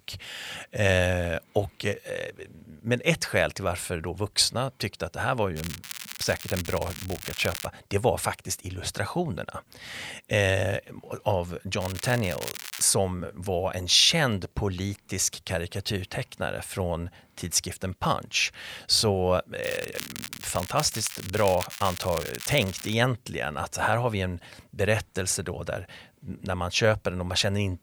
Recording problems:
crackling; noticeable; from 5.5 to 7.5 s, from 12 to 13 s and from 20 to 23 s; 10 dB below the speech

